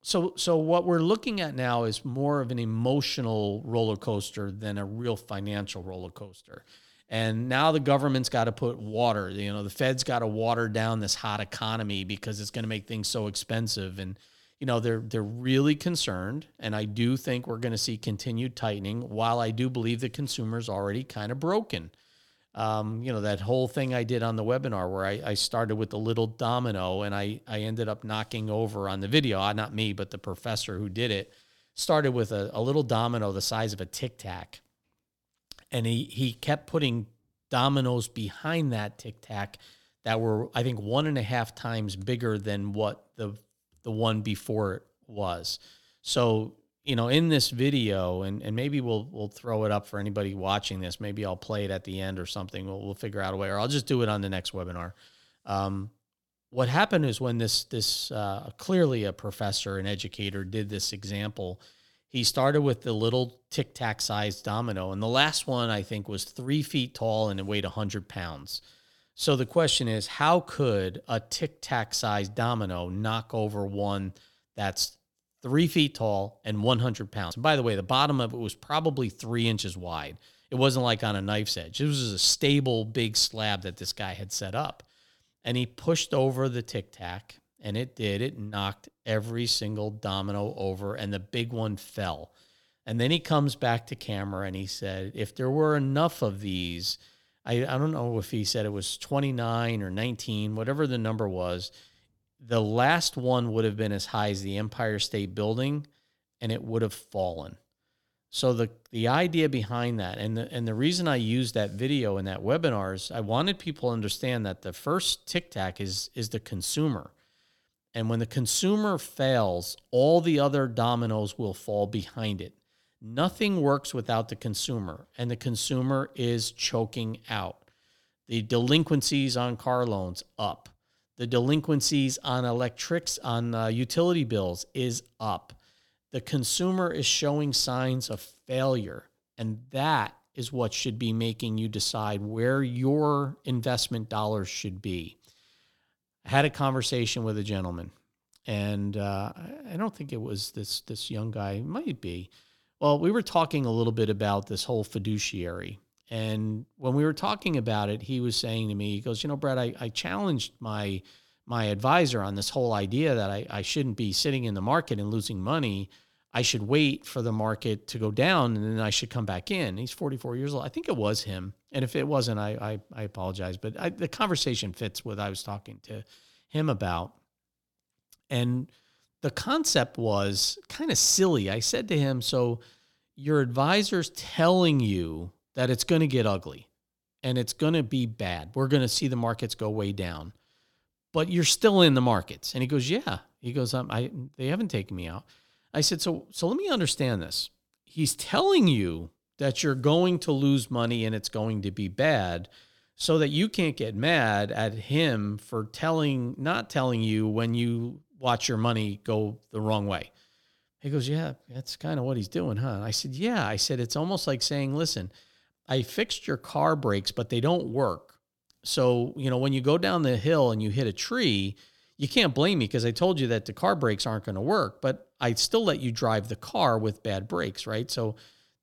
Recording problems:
none

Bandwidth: 17 kHz